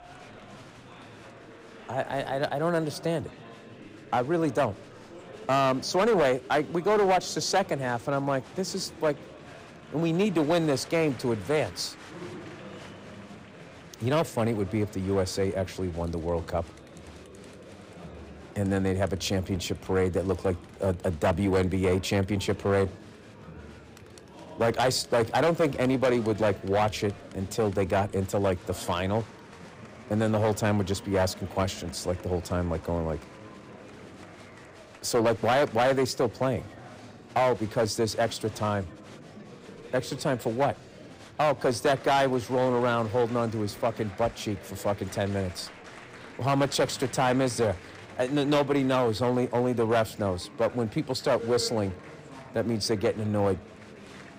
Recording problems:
distortion; slight; 5% of the sound clipped
murmuring crowd; noticeable; throughout; 20 dB below the speech

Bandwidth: 15.5 kHz